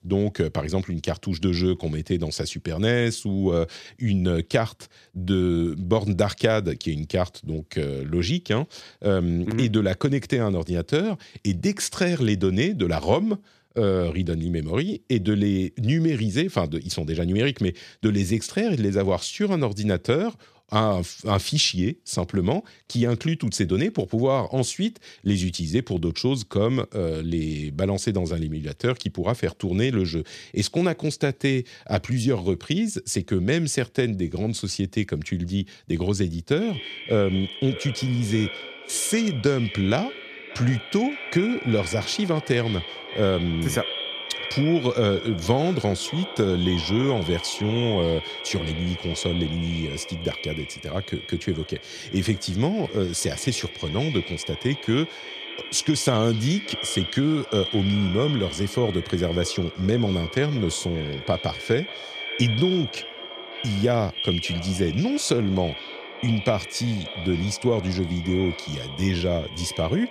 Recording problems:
echo of what is said; strong; from 37 s on; 580 ms later, 9 dB below the speech

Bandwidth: 14 kHz